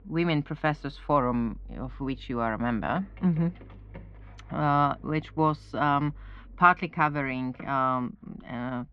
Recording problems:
muffled; very; fading above 2.5 kHz
traffic noise; faint; throughout; 20 dB below the speech

